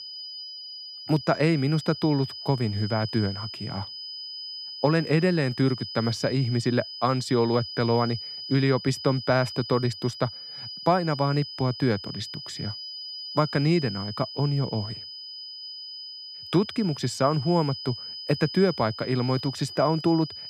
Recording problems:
high-pitched whine; loud; throughout; 5 kHz, 10 dB below the speech

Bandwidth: 14 kHz